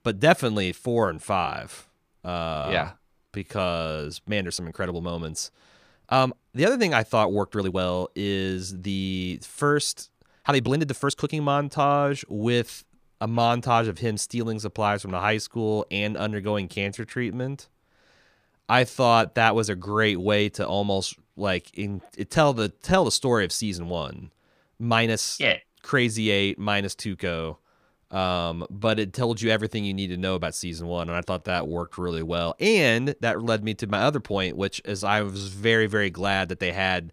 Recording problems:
uneven, jittery; strongly; from 1 to 36 s

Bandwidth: 15 kHz